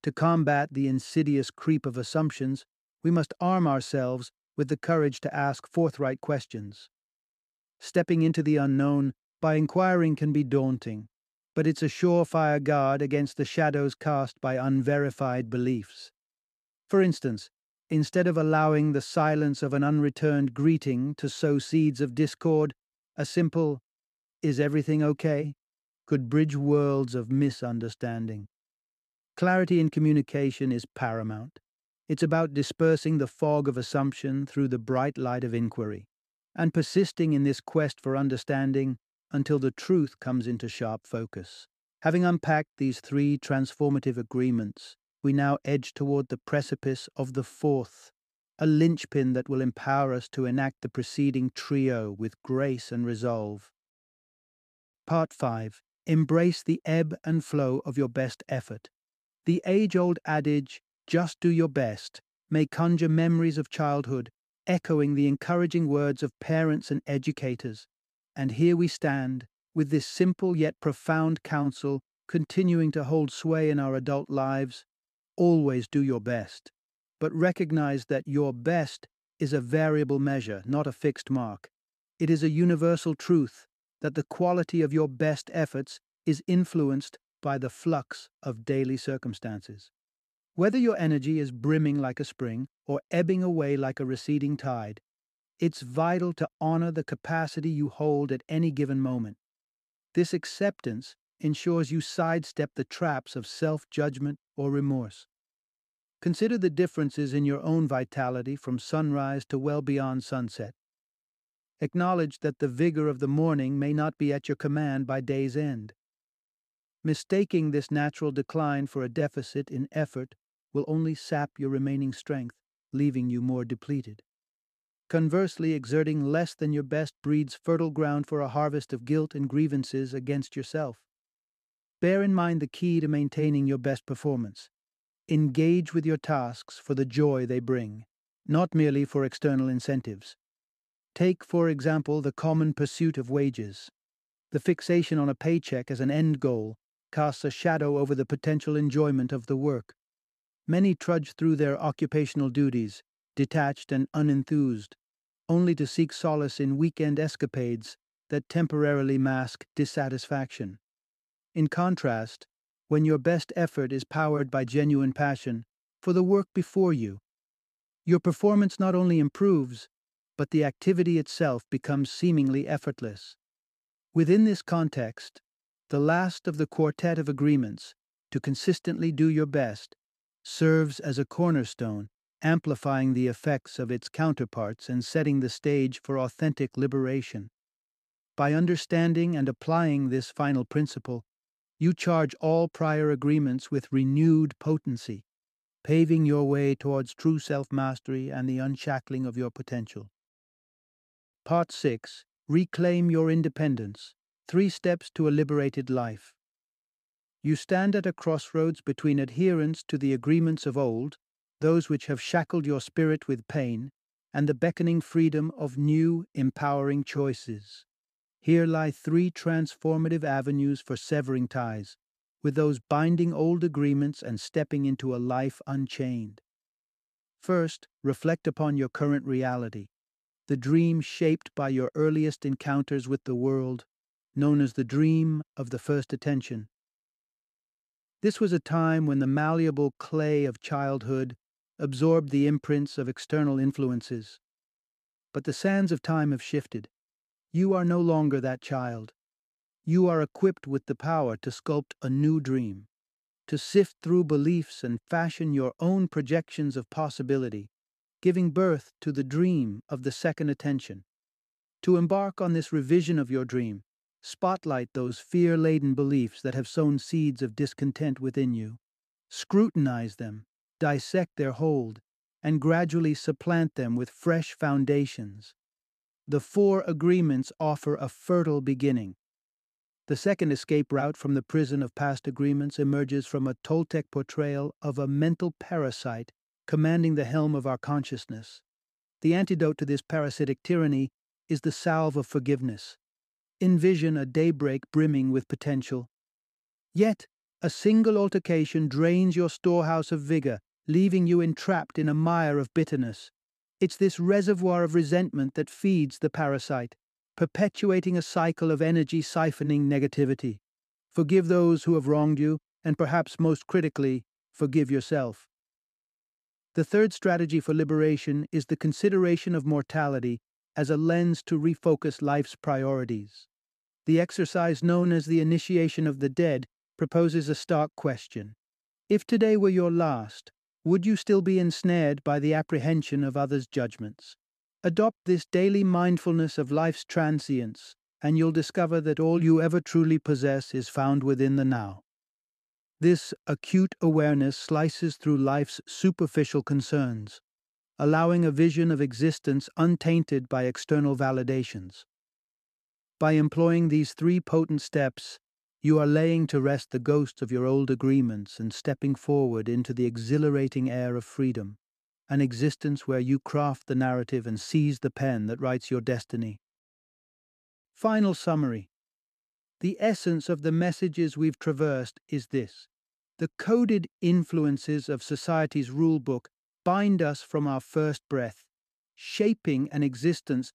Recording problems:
none

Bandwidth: 14.5 kHz